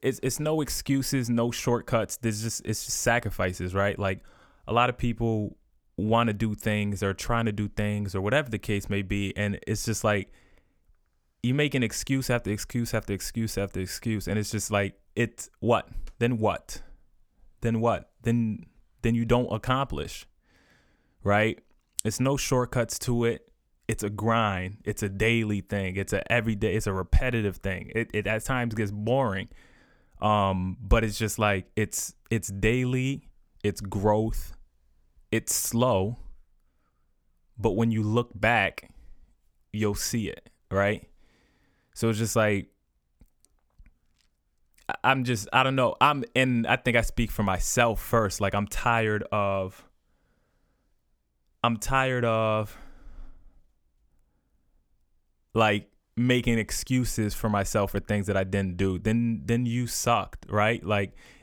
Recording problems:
none

